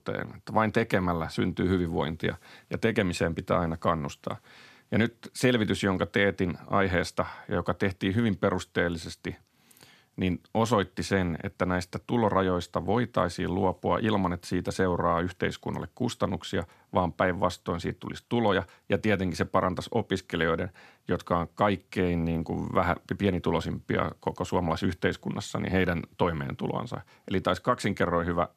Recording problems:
none

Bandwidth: 14 kHz